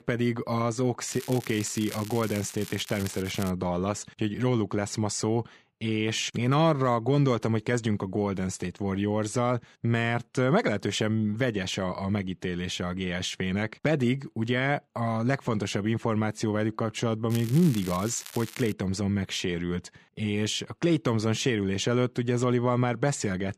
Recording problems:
crackling; noticeable; from 1 to 3.5 s and from 17 to 19 s; 15 dB below the speech

